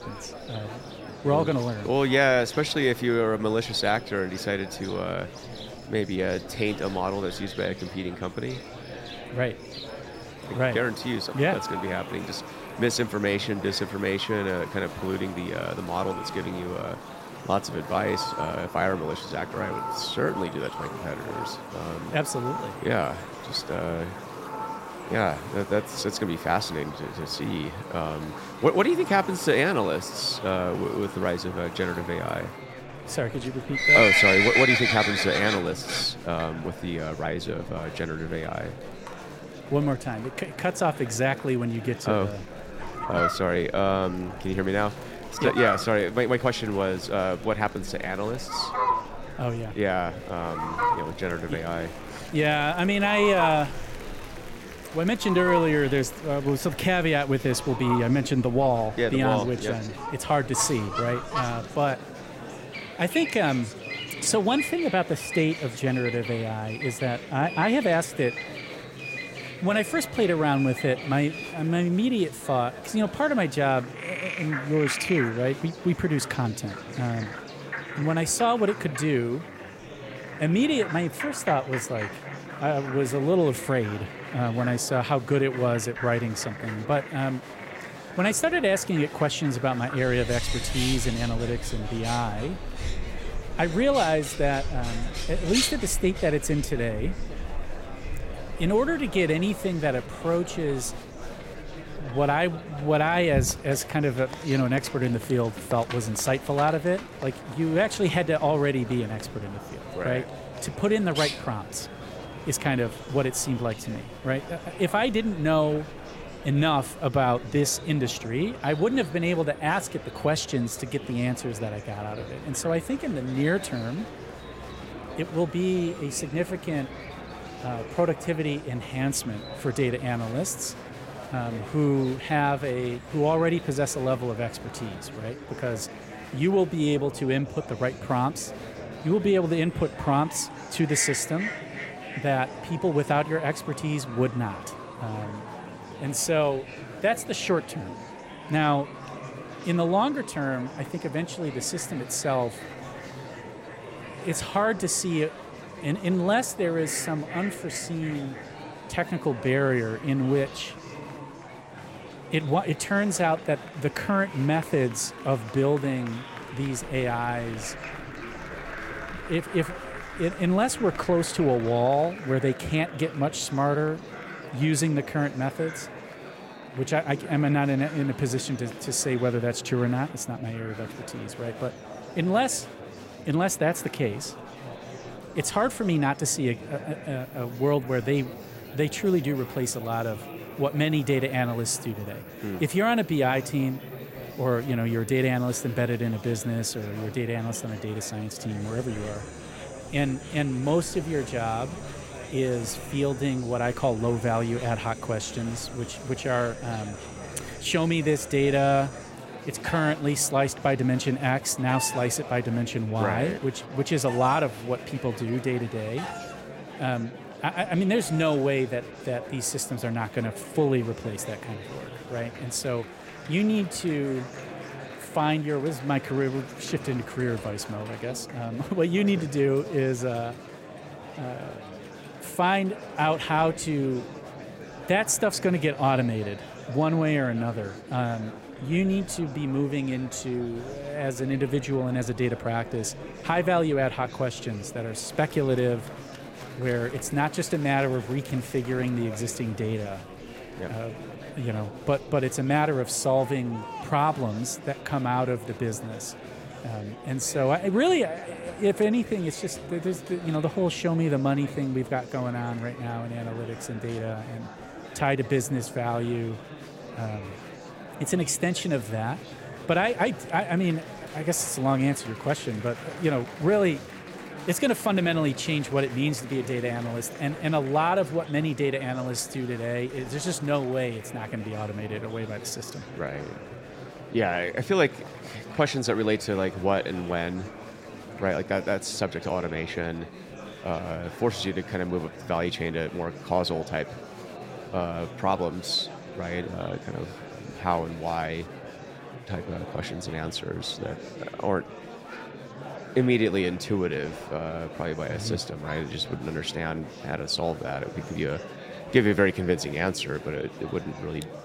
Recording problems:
animal sounds; loud; throughout; 8 dB below the speech
murmuring crowd; noticeable; throughout; 15 dB below the speech

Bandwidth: 16 kHz